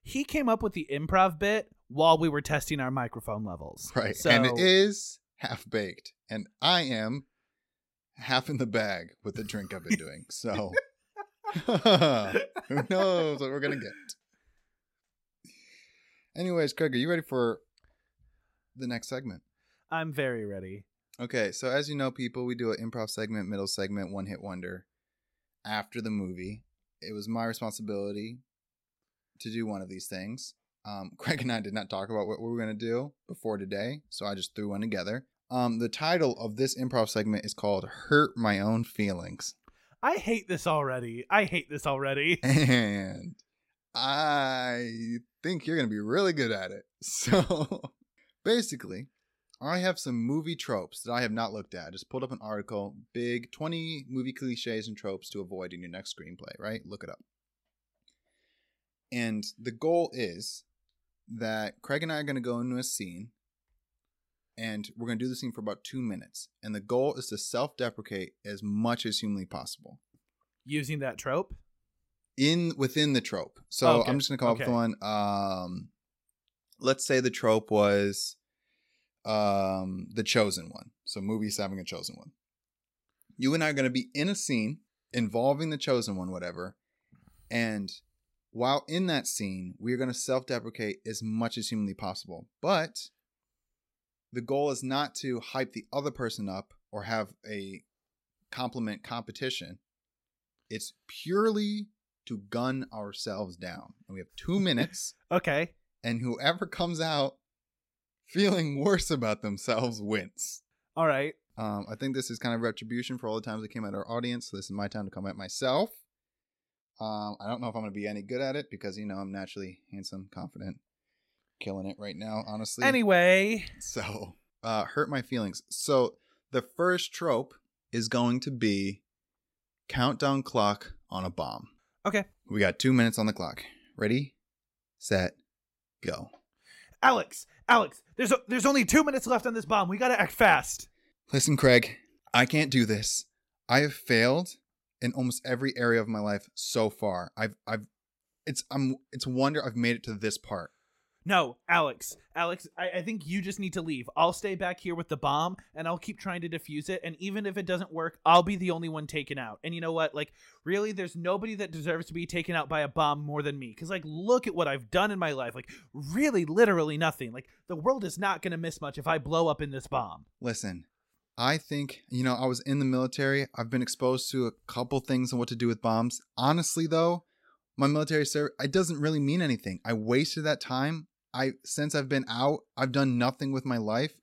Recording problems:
none

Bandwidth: 16 kHz